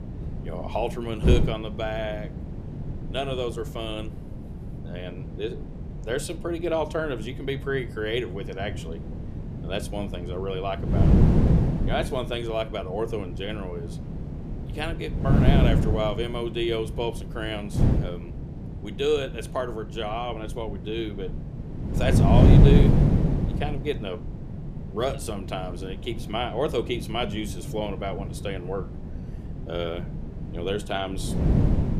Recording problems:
wind noise on the microphone; heavy; 5 dB below the speech

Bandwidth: 14.5 kHz